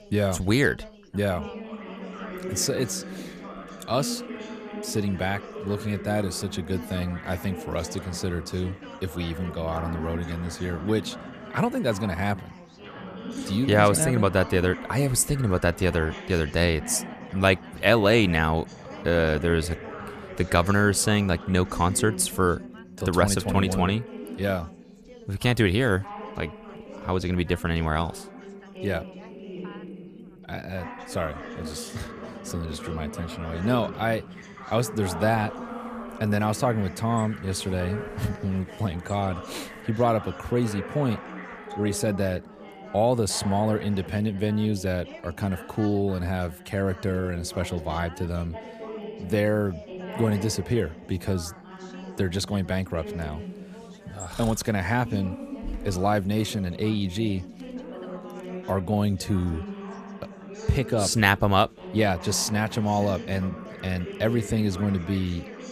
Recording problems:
background chatter; noticeable; throughout; 4 voices, 15 dB below the speech

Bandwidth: 14.5 kHz